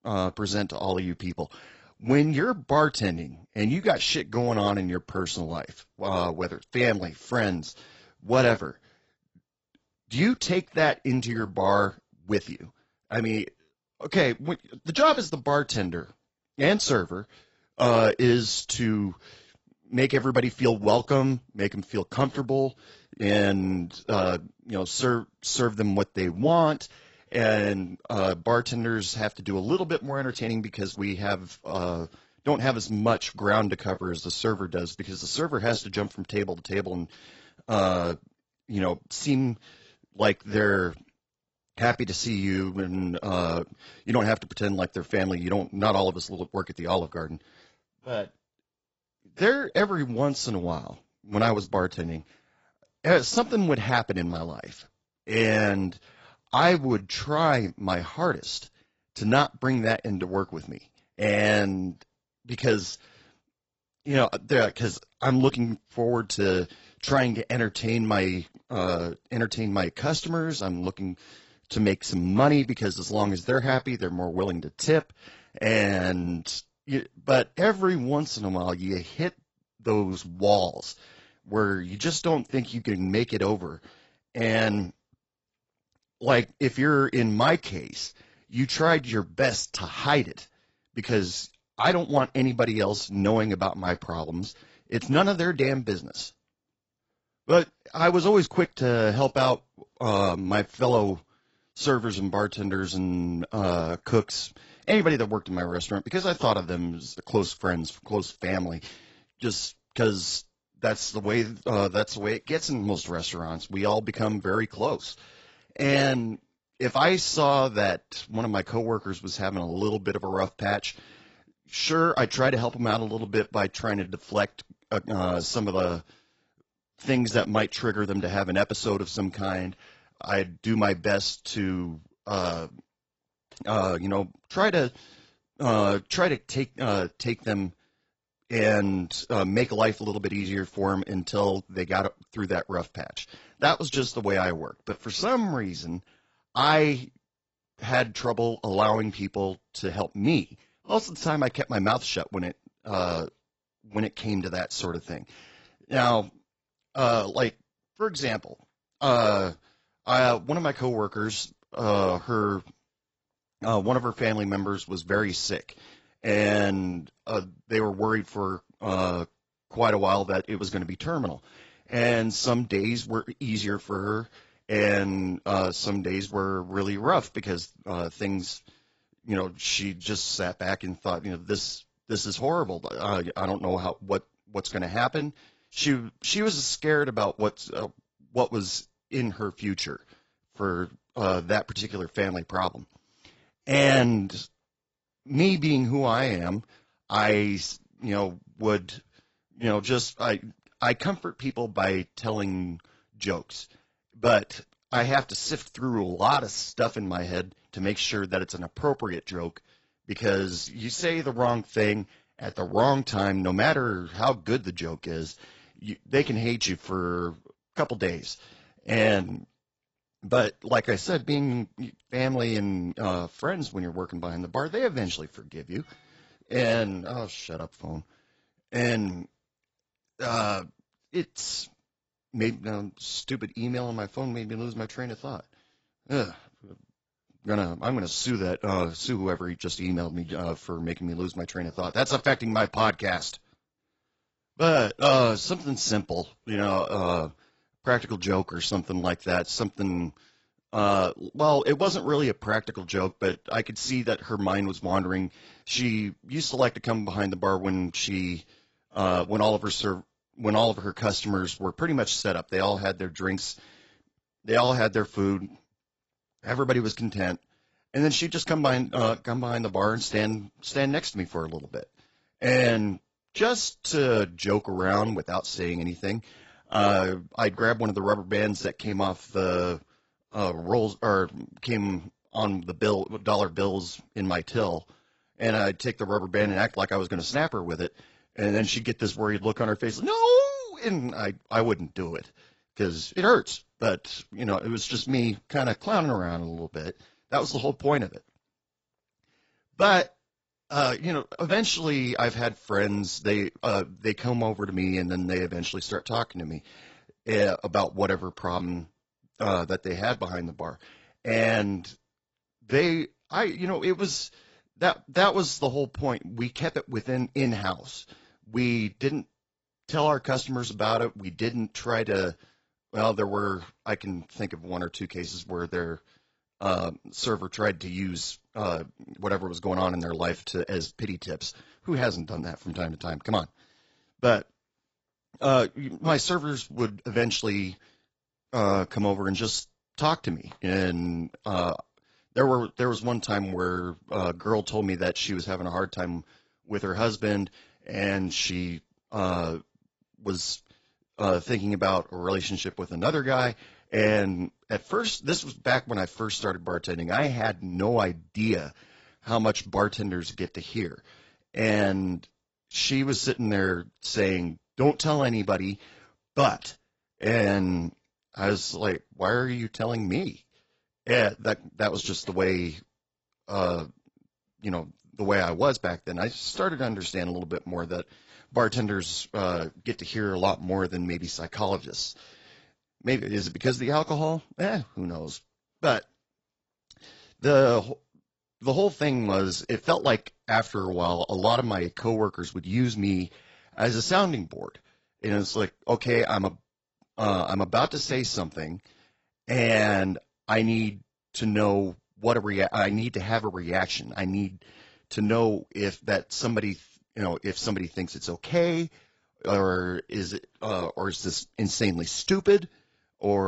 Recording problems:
garbled, watery; badly; nothing above 7.5 kHz
abrupt cut into speech; at the end

